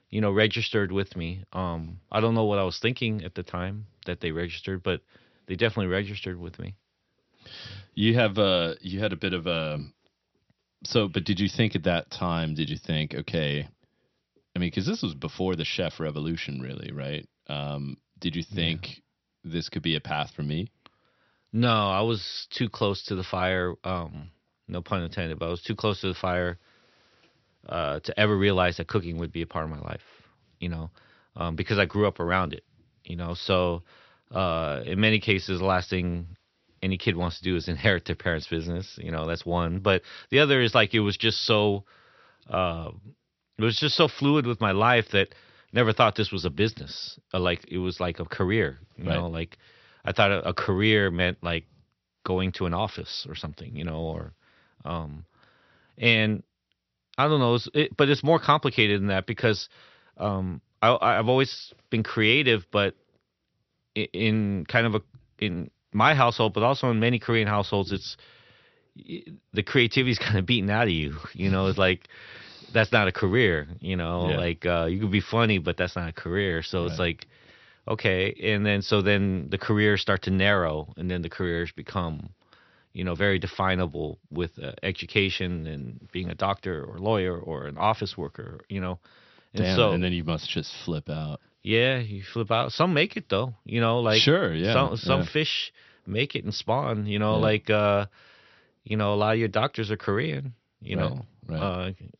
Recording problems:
high frequencies cut off; noticeable; nothing above 6 kHz

